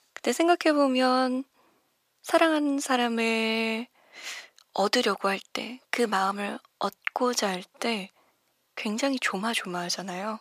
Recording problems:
thin; somewhat; fading below 600 Hz

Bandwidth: 15 kHz